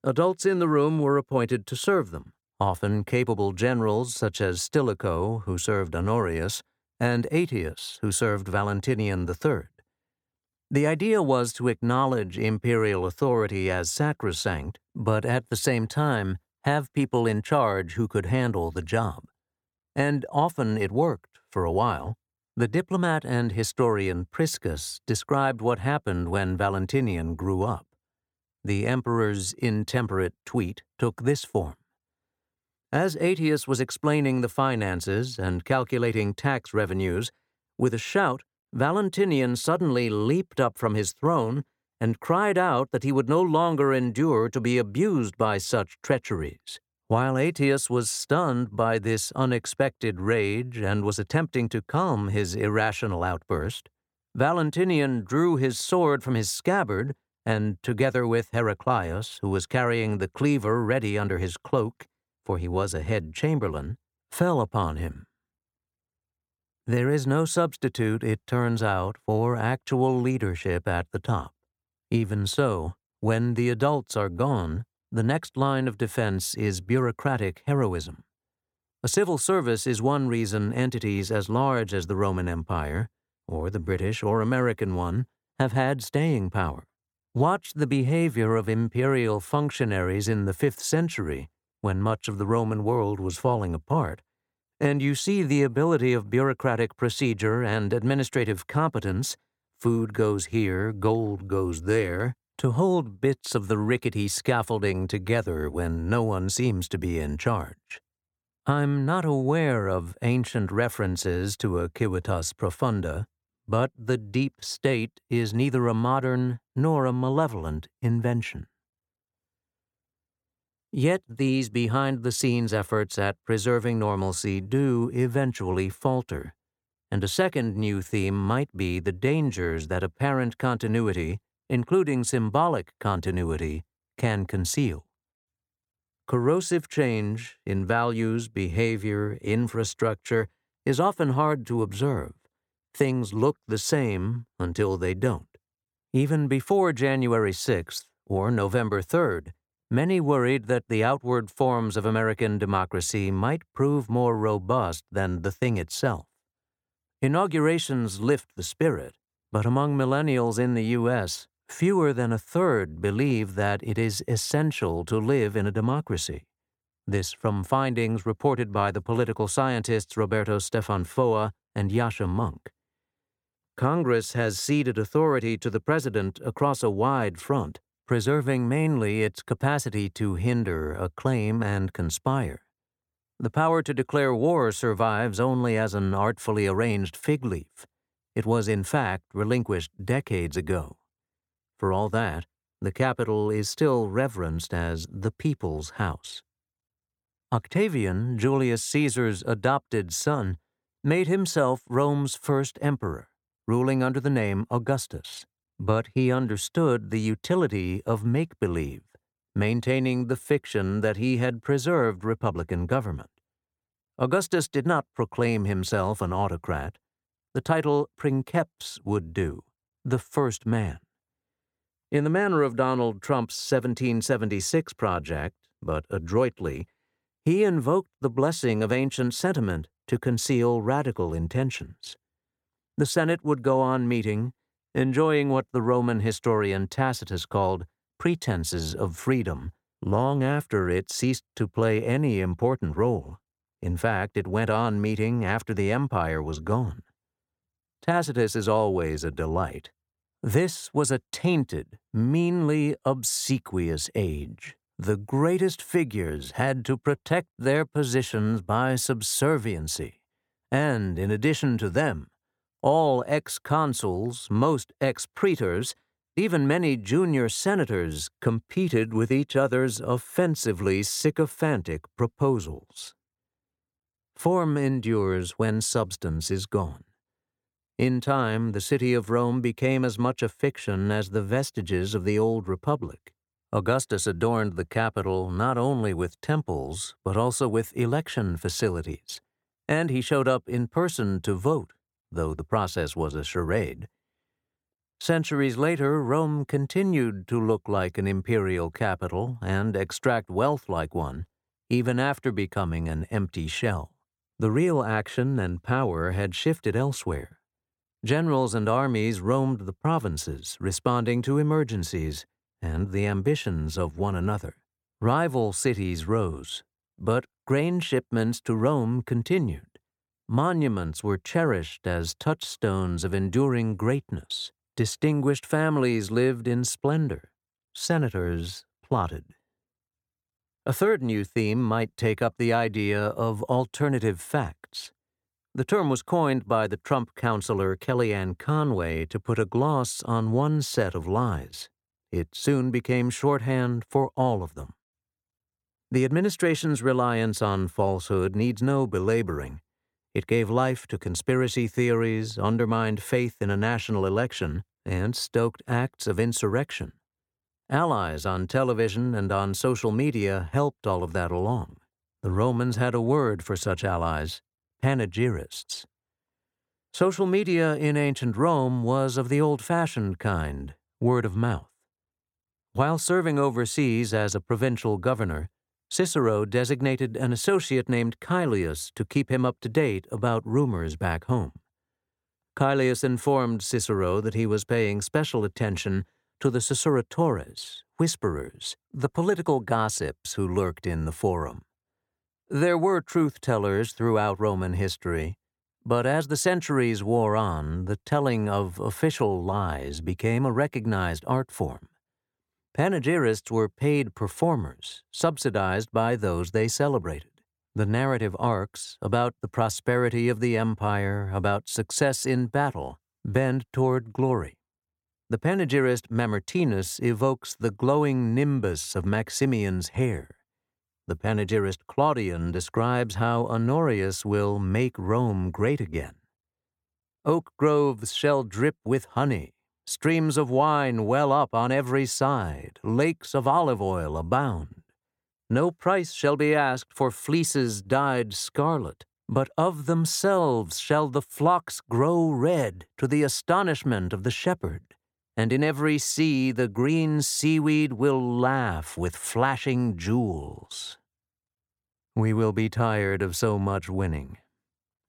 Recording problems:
none

